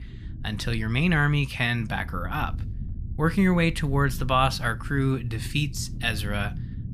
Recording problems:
low rumble; faint; throughout; 20 dB below the speech

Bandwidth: 15 kHz